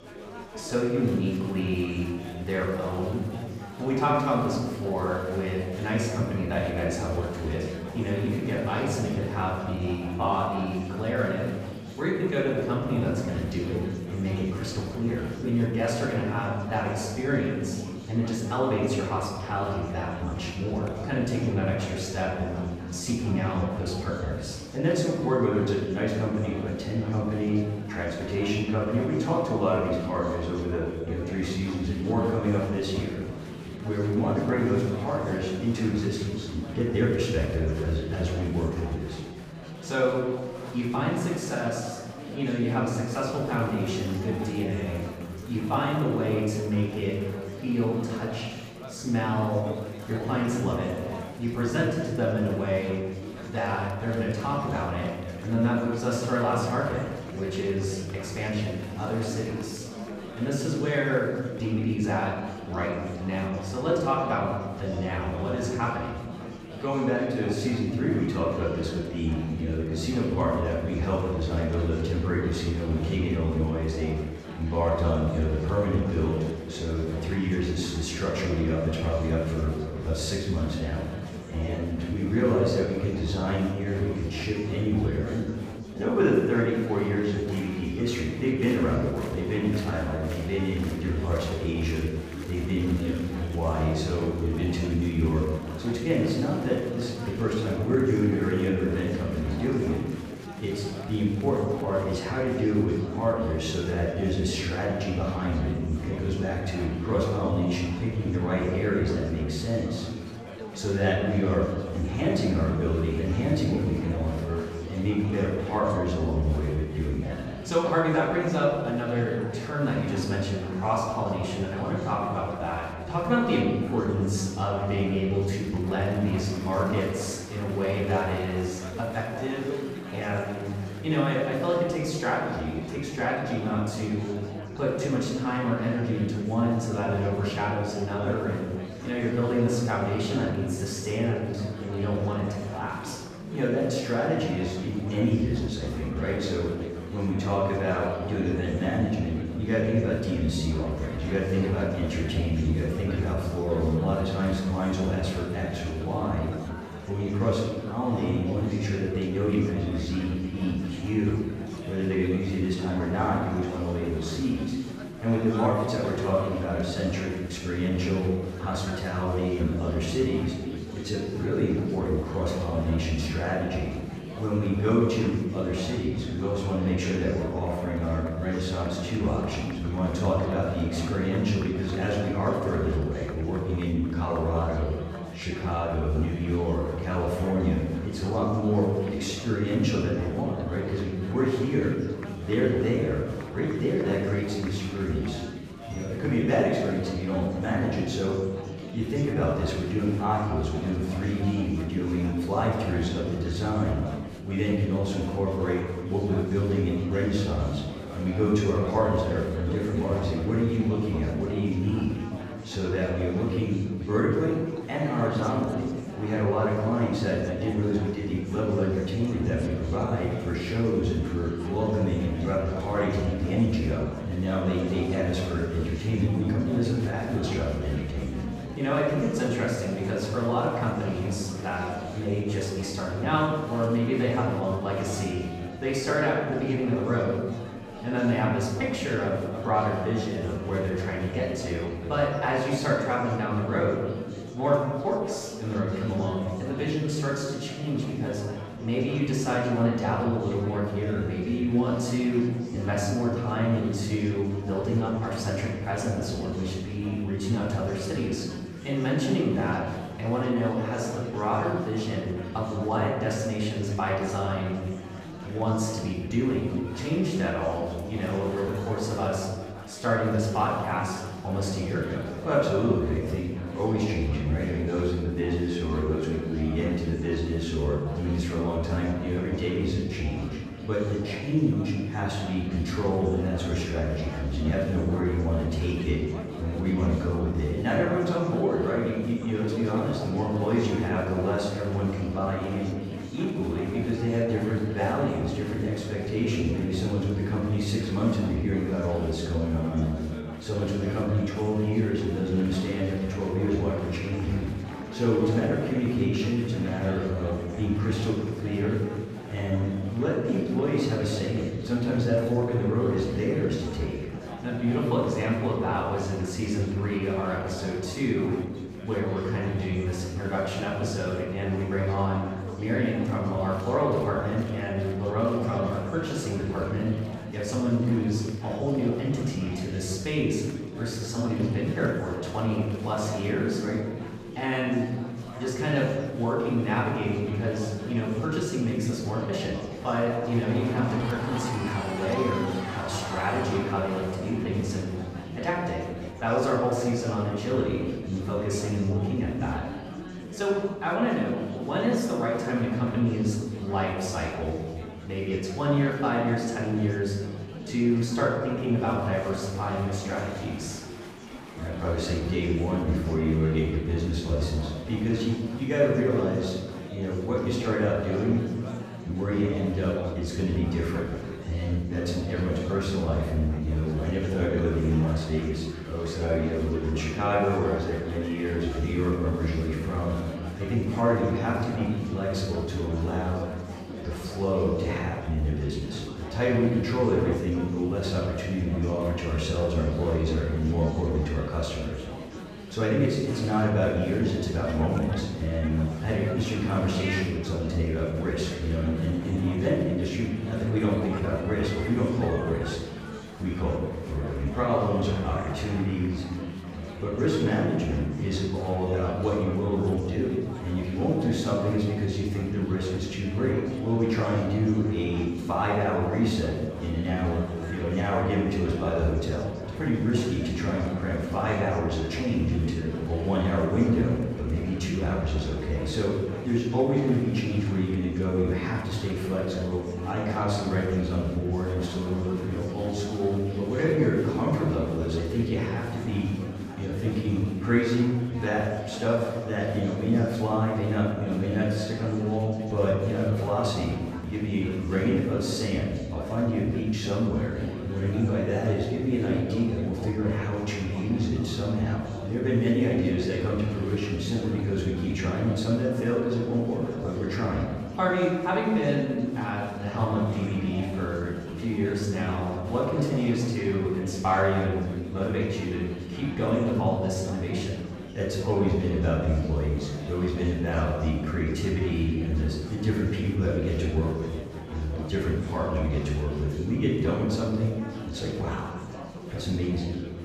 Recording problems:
off-mic speech; far
room echo; noticeable; dies away in 1.1 s
chatter from many people; noticeable; throughout; 10 dB below the speech

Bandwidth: 15 kHz